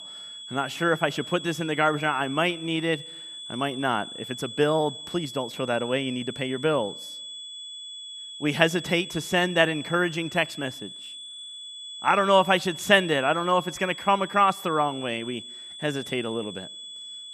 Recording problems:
high-pitched whine; noticeable; throughout; 3.5 kHz, 10 dB below the speech

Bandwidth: 14.5 kHz